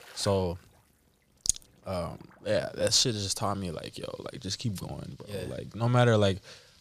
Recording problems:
rain or running water; faint; throughout; 30 dB below the speech

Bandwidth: 15 kHz